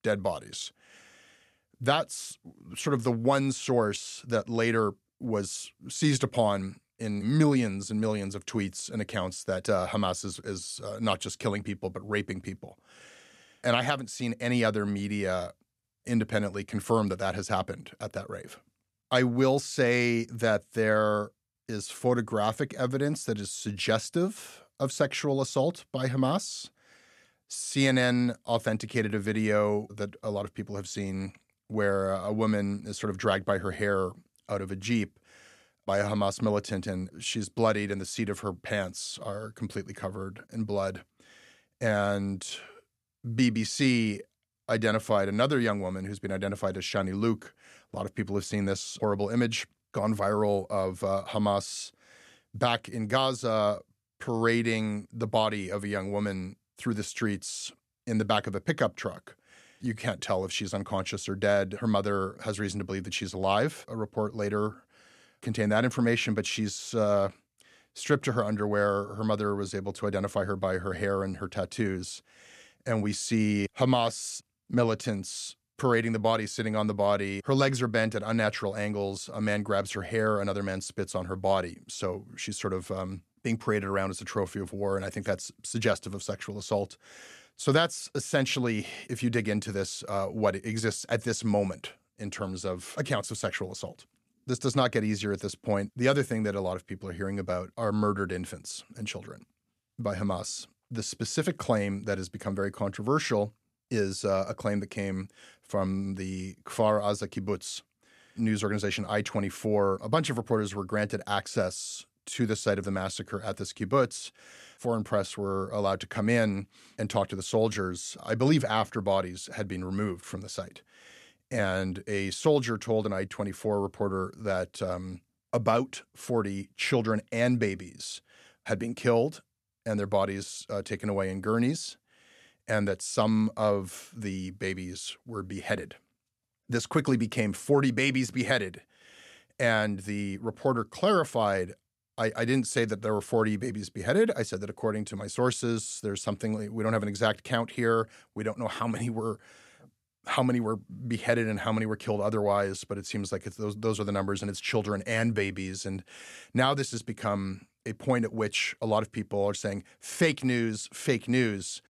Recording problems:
none

